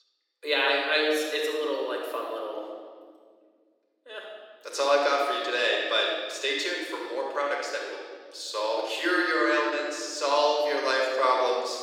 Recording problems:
off-mic speech; far
room echo; noticeable; dies away in 1.9 s
thin; somewhat; fading below 300 Hz

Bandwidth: 17.5 kHz